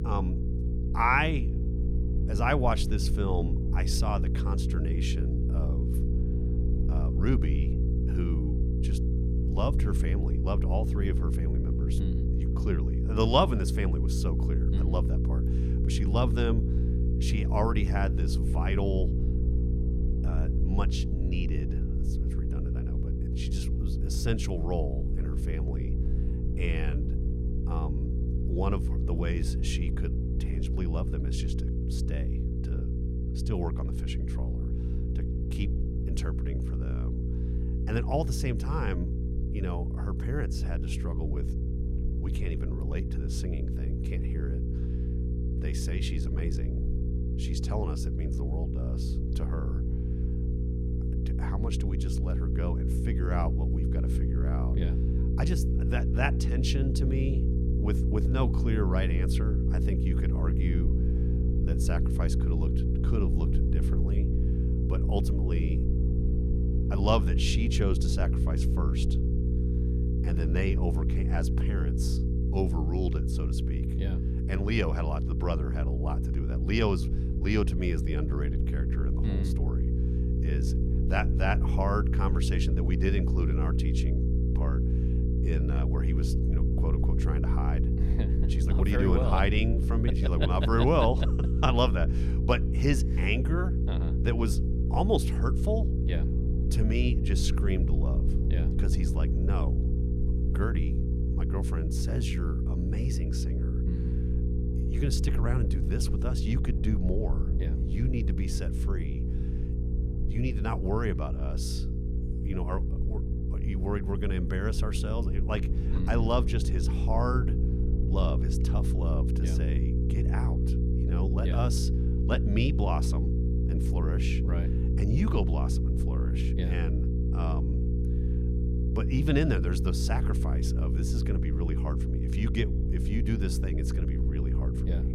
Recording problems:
electrical hum; loud; throughout; 60 Hz, 6 dB below the speech
low rumble; faint; throughout; 20 dB below the speech

